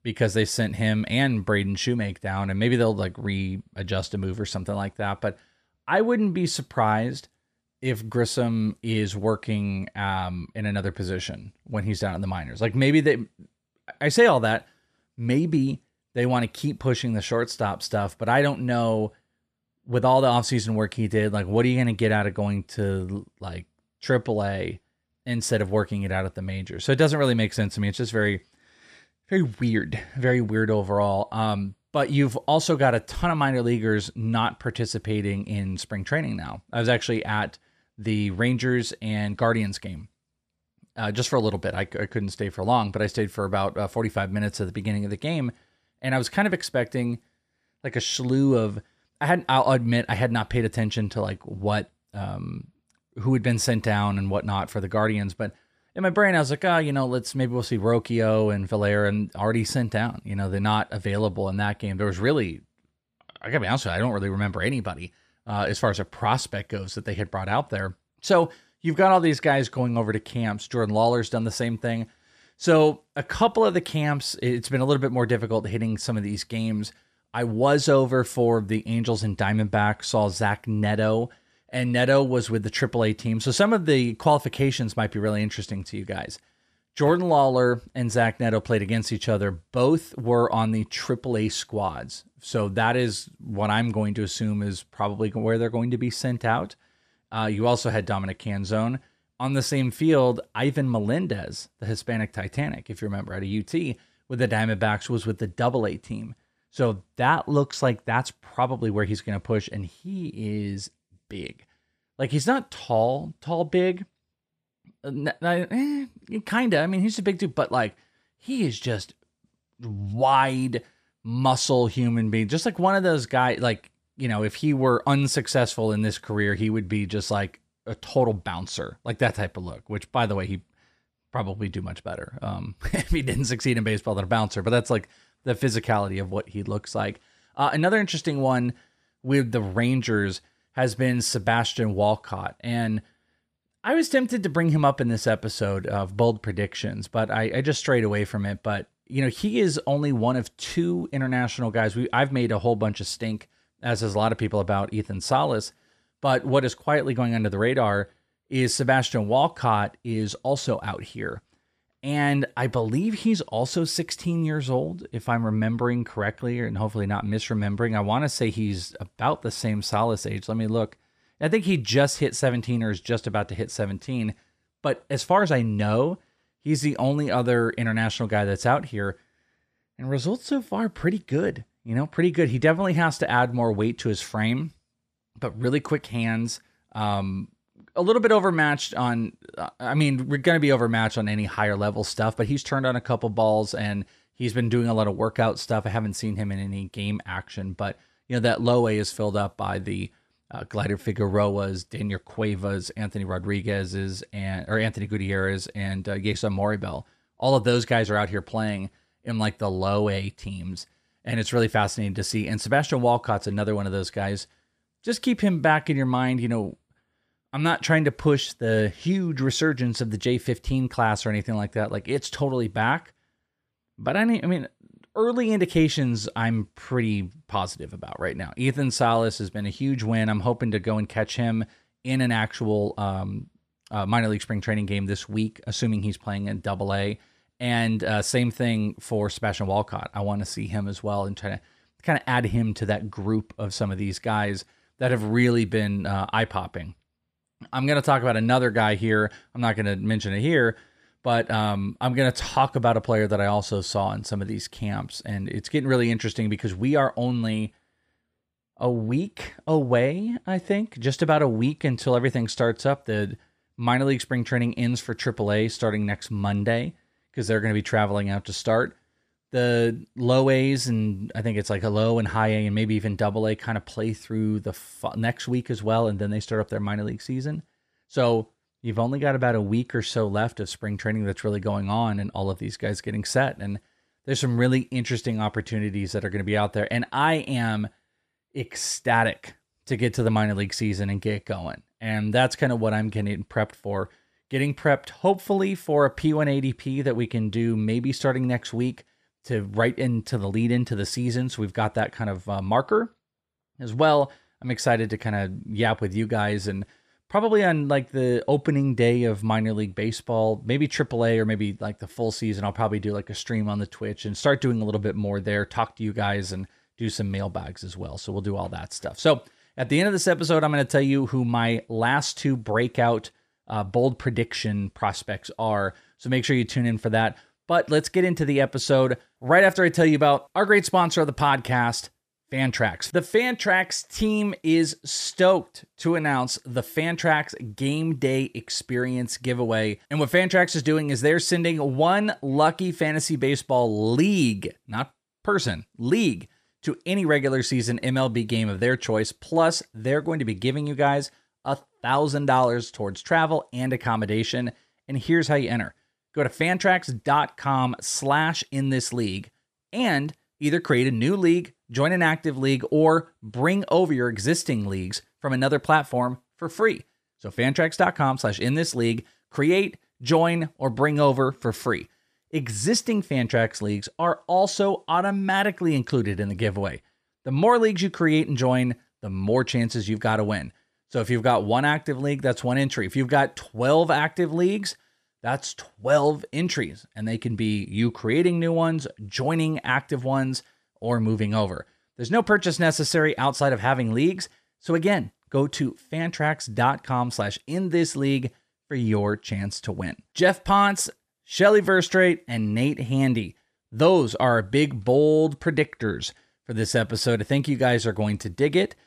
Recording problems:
none

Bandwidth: 14.5 kHz